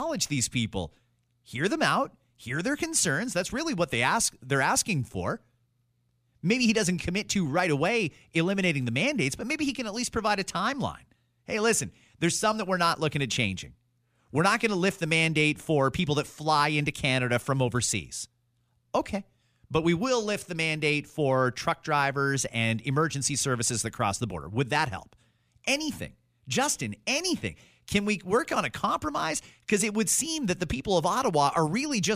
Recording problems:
abrupt cut into speech; at the start and the end

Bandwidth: 14.5 kHz